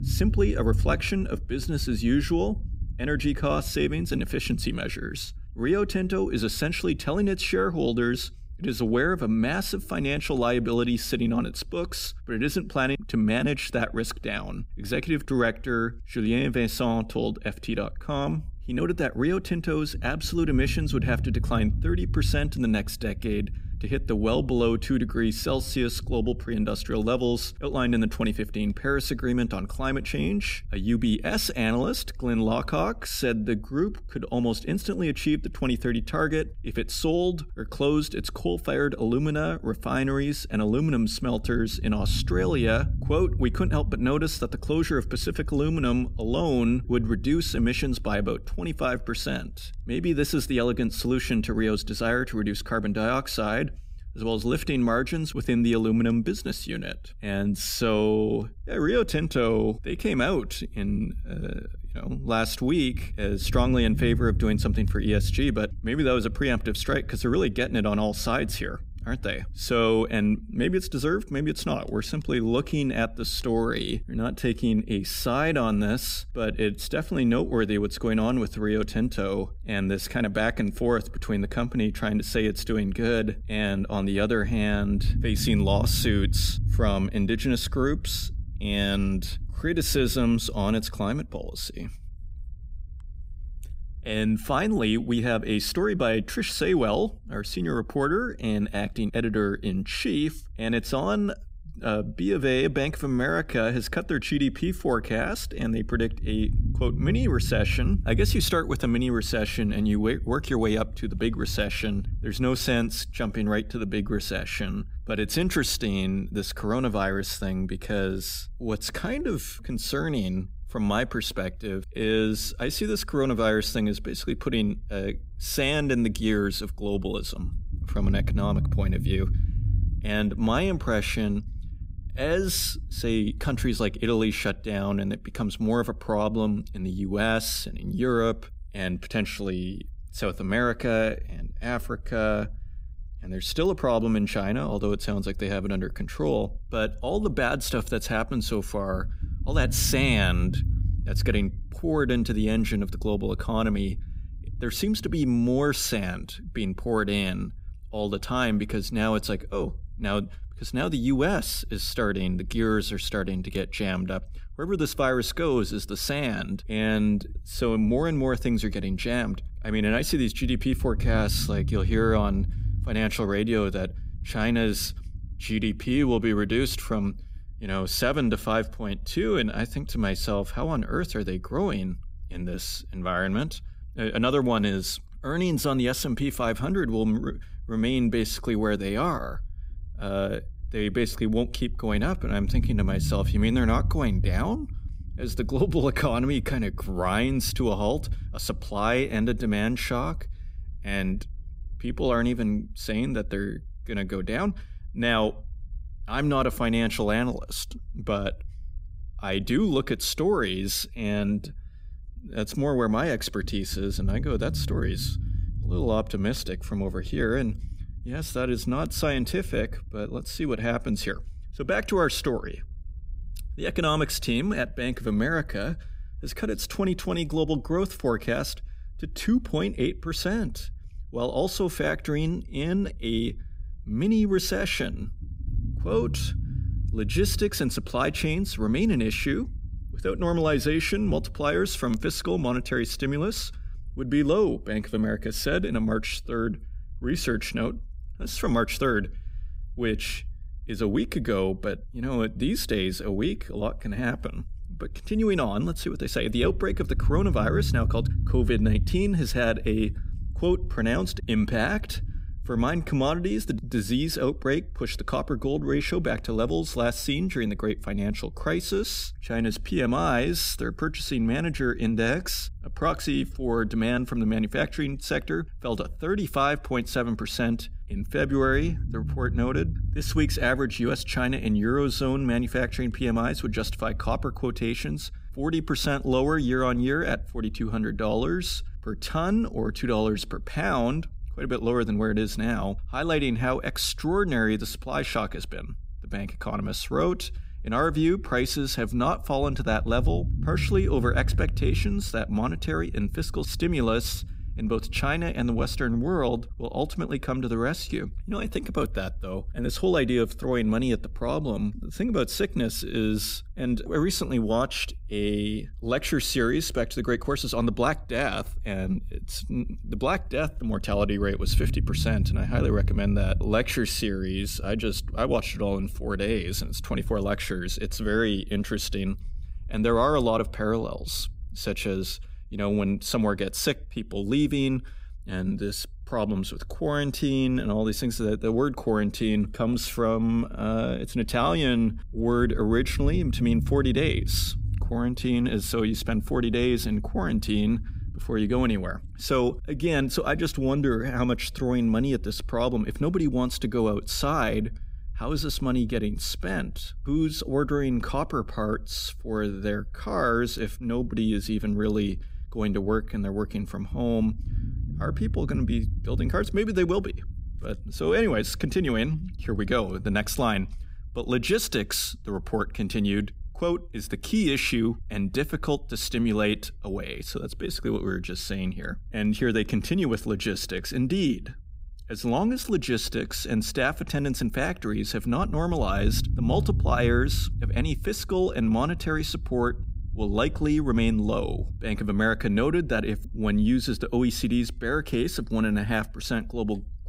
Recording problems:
low rumble; faint; throughout; 20 dB below the speech

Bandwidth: 15.5 kHz